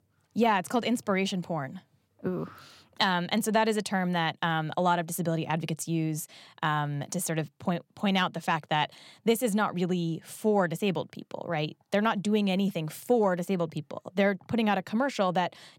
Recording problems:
none

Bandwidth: 16.5 kHz